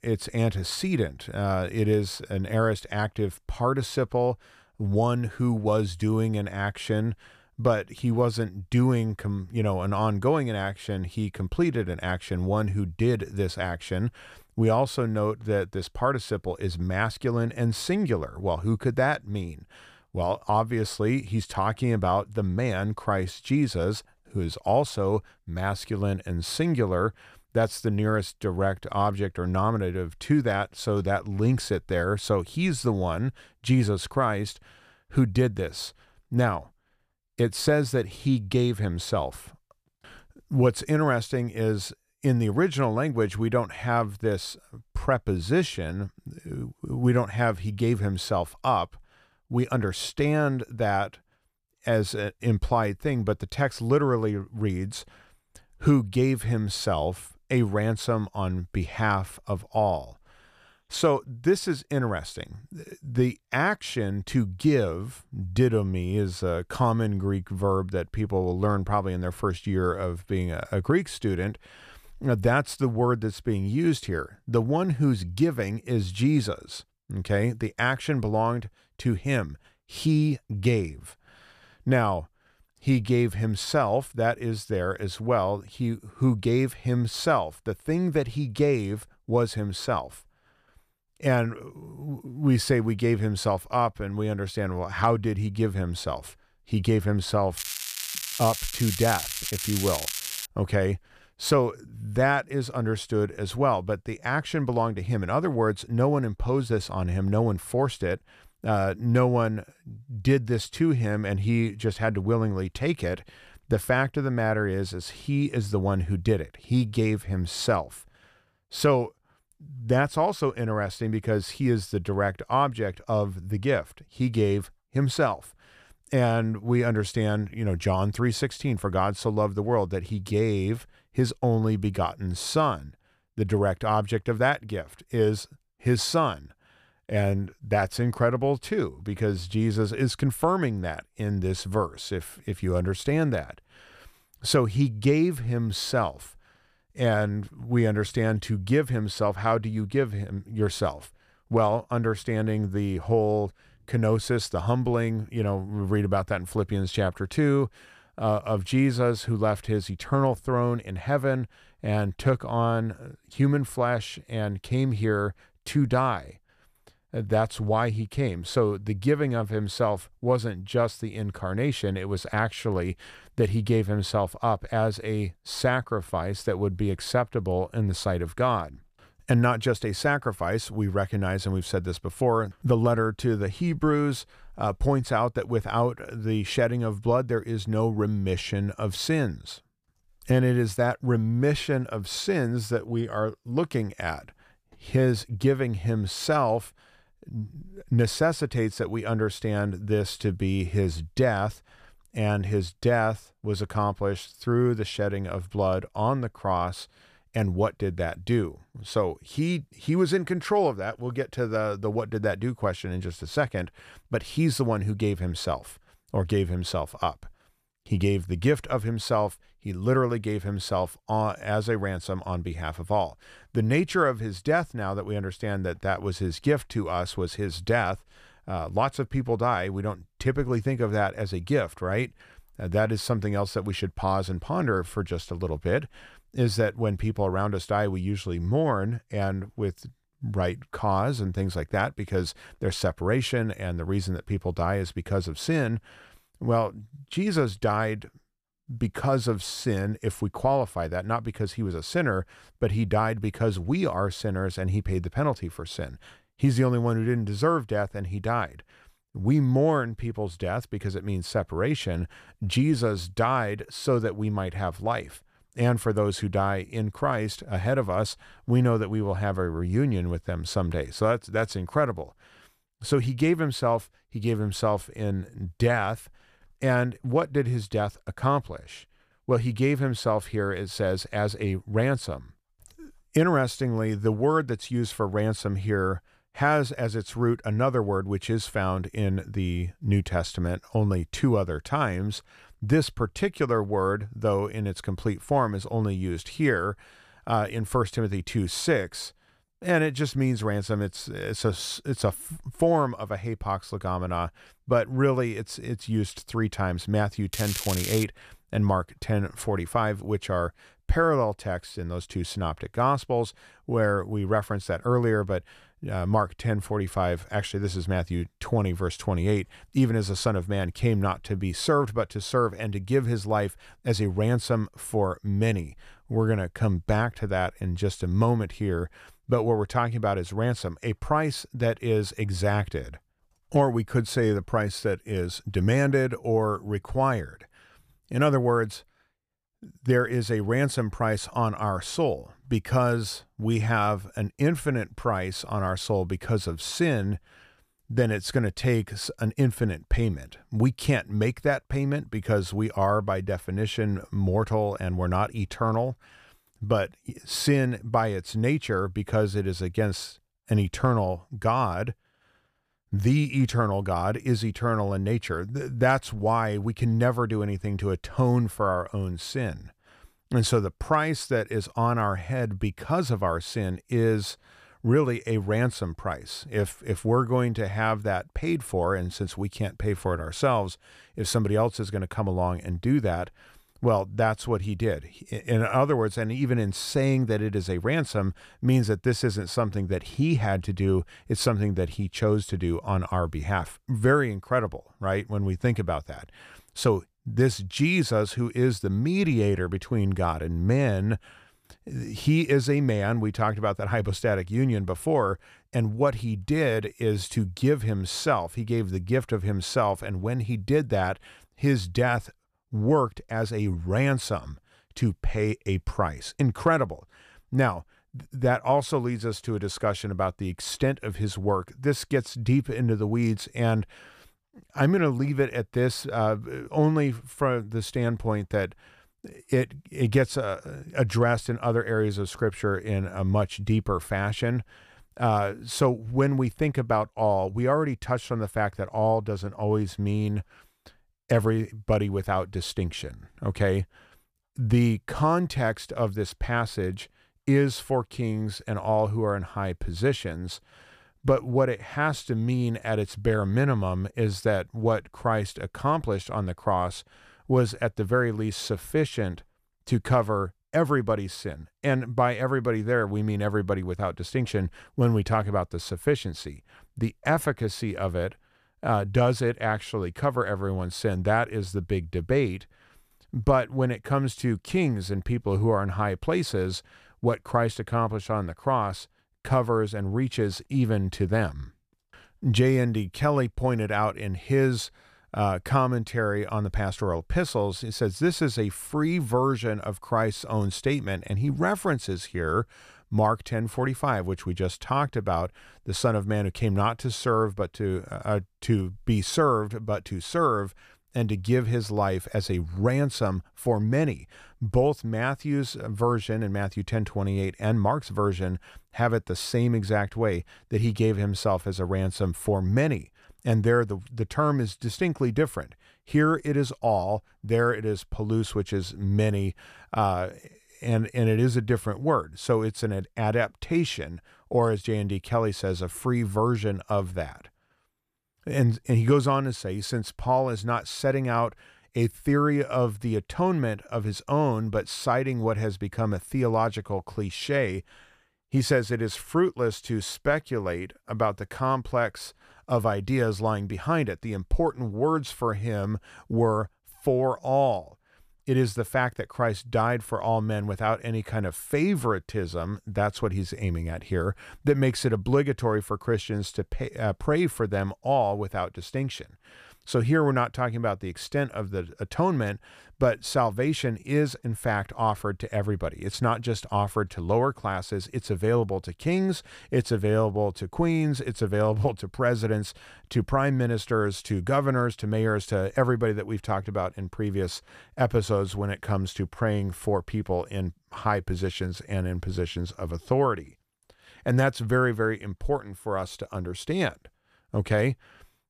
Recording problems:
crackling; loud; from 1:38 to 1:40 and at 5:07; 4 dB below the speech

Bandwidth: 14.5 kHz